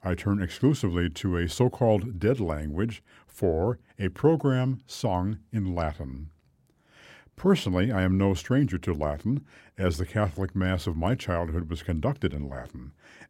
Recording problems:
none

